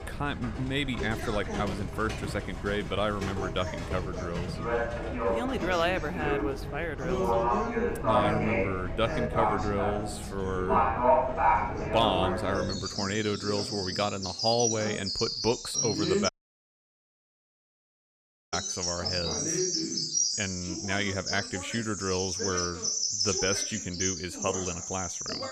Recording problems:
animal sounds; very loud; throughout; 1 dB above the speech
voice in the background; loud; throughout; 6 dB below the speech
audio cutting out; at 16 s for 2 s

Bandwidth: 15.5 kHz